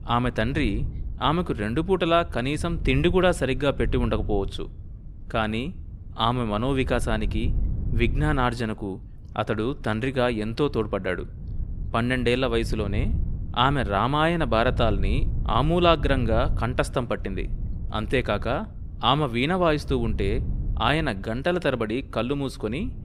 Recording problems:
wind noise on the microphone; occasional gusts; 25 dB below the speech

